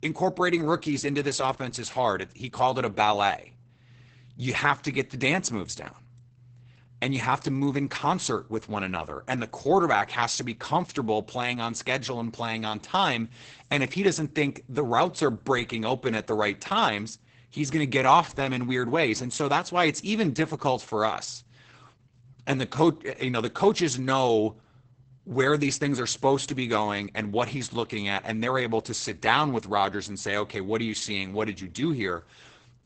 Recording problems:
garbled, watery; badly; nothing above 8 kHz

